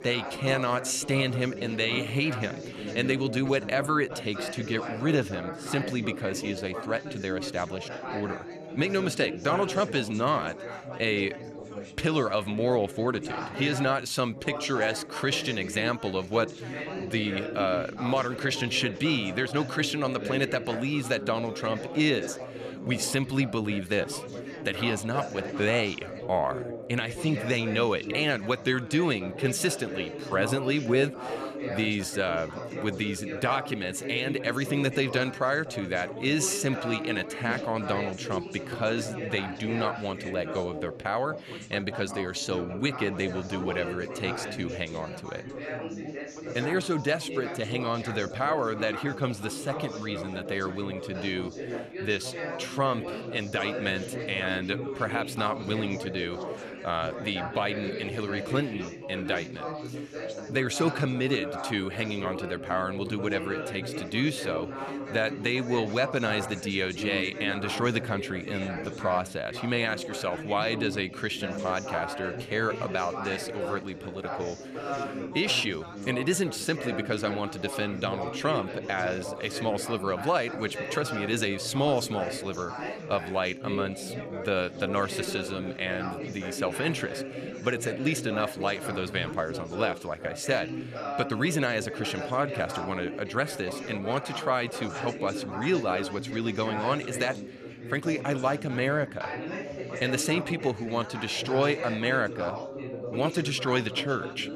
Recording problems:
background chatter; loud; throughout; 4 voices, 7 dB below the speech

